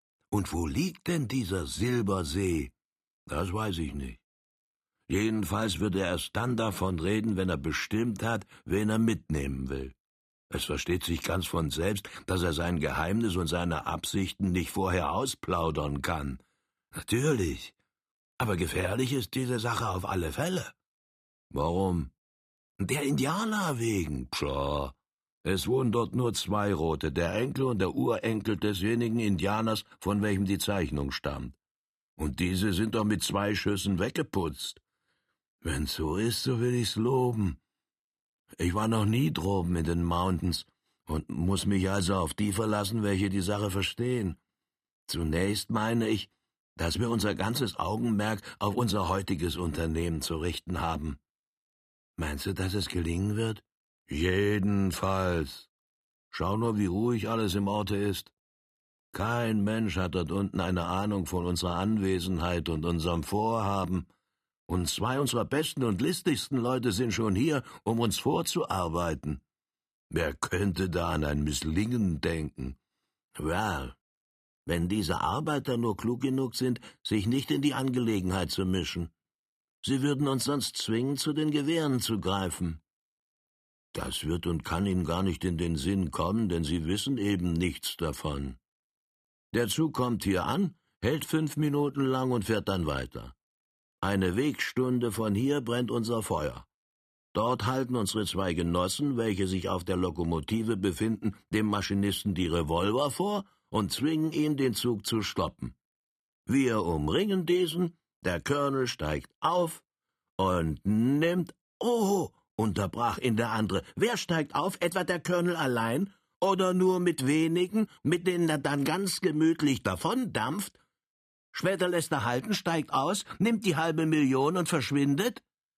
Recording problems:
none

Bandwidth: 14.5 kHz